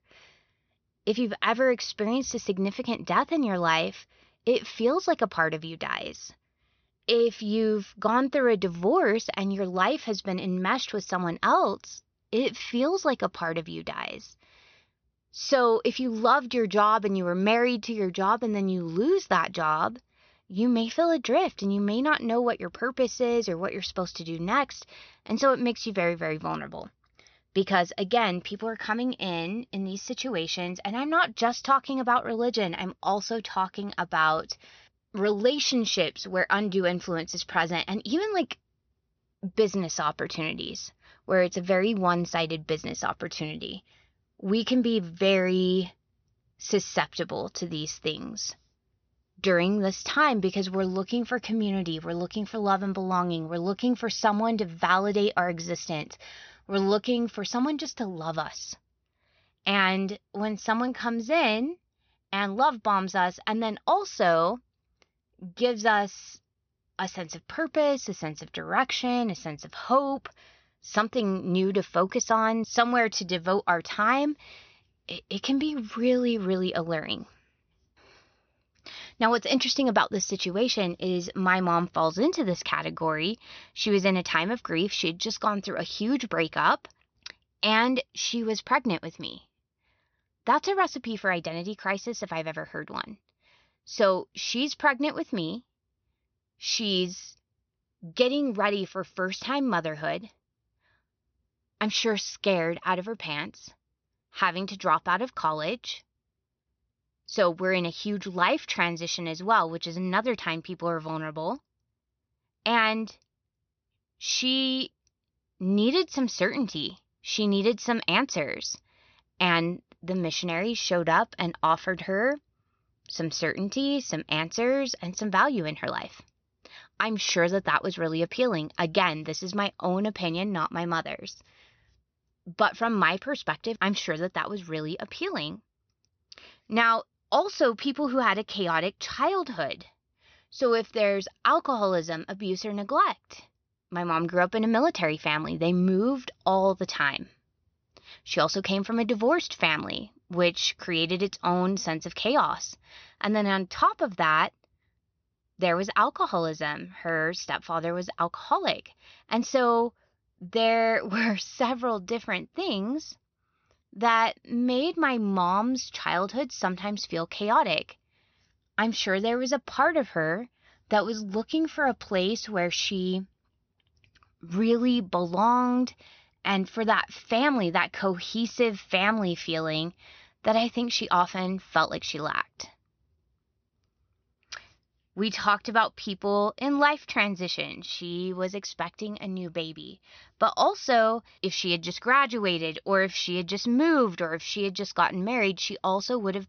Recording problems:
high frequencies cut off; noticeable; nothing above 6 kHz

